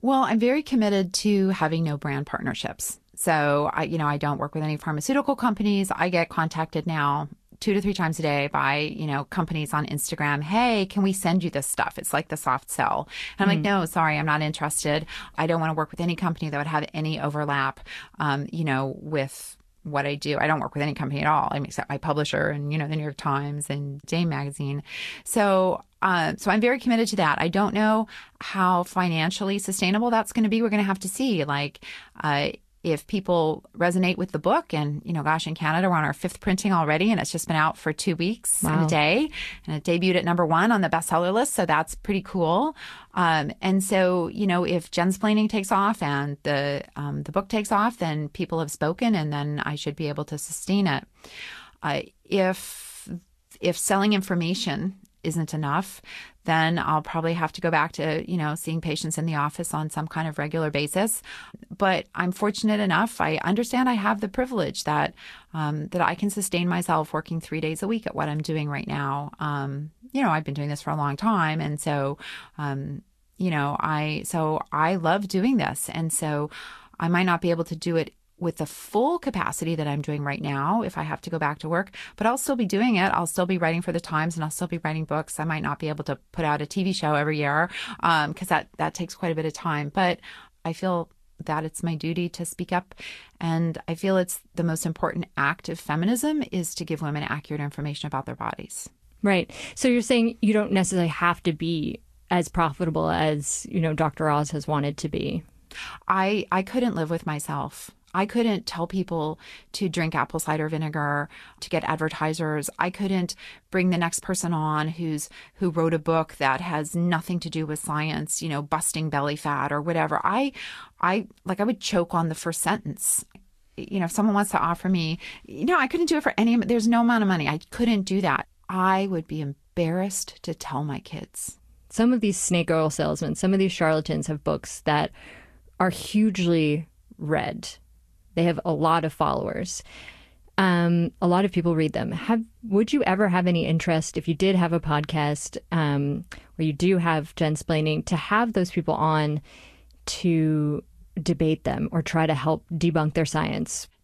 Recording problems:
garbled, watery; slightly; nothing above 12.5 kHz

